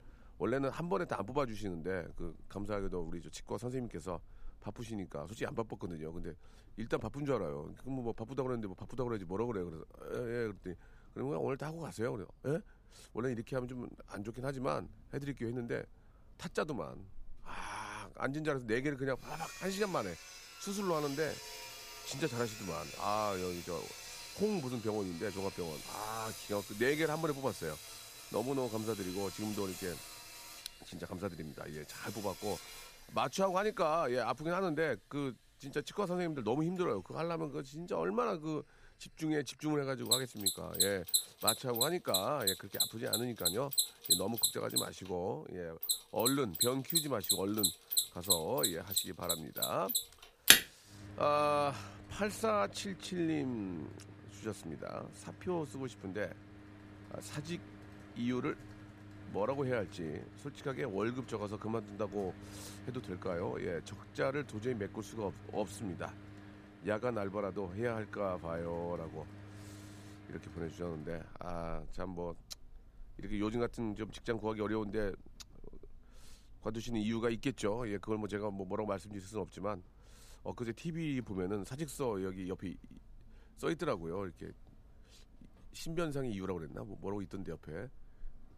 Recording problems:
machinery noise; very loud; throughout; 3 dB above the speech

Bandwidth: 15 kHz